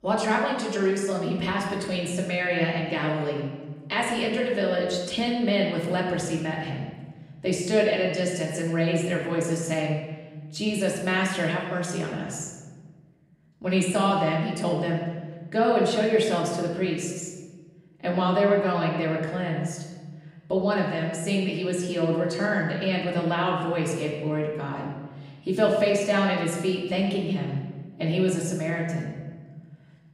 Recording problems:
off-mic speech; far
room echo; noticeable; dies away in 1.2 s

